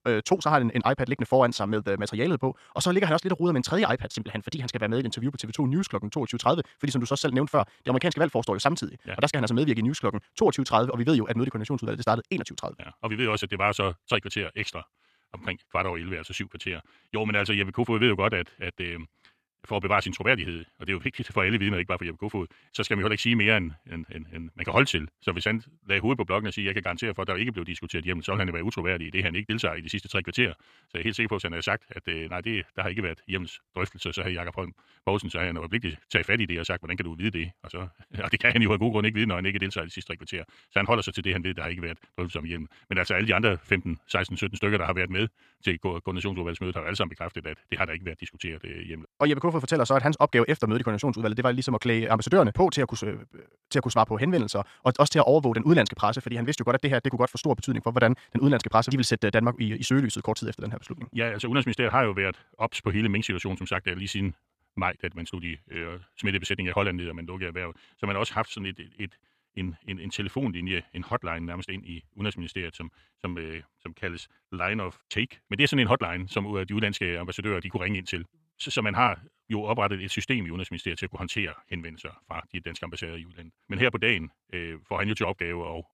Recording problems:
wrong speed, natural pitch; too fast; 1.5 times normal speed

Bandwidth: 14 kHz